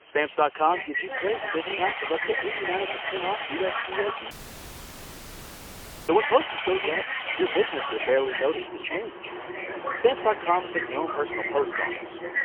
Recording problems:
phone-call audio; poor line; nothing above 3 kHz
machinery noise; loud; throughout; 7 dB below the speech
voice in the background; loud; throughout; 4 dB below the speech
hiss; faint; throughout; 25 dB below the speech
audio cutting out; at 4.5 s for 2 s

